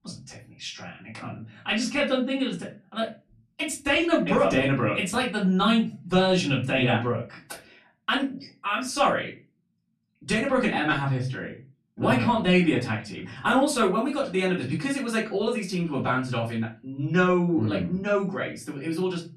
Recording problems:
off-mic speech; far
room echo; very slight; dies away in 0.3 s

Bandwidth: 13.5 kHz